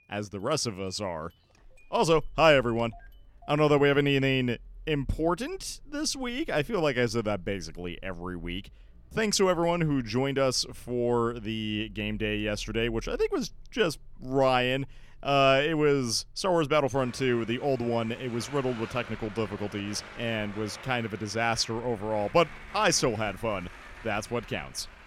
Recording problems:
traffic noise; faint; throughout; 20 dB below the speech

